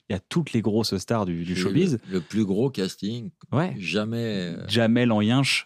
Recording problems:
none

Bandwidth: 15 kHz